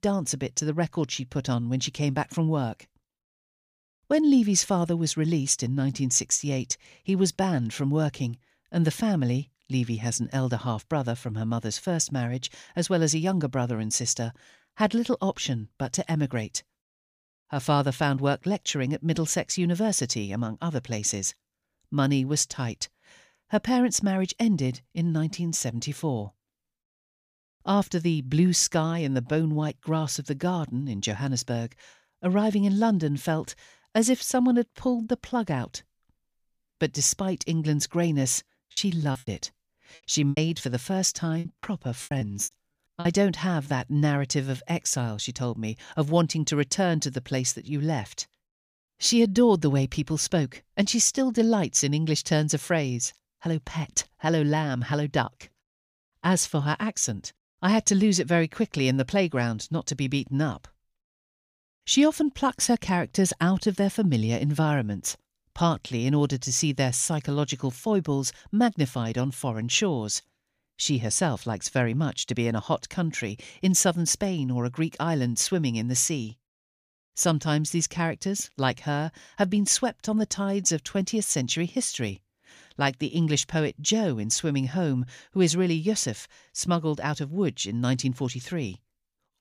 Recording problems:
choppy; very; from 39 to 43 s; 18% of the speech affected

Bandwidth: 15 kHz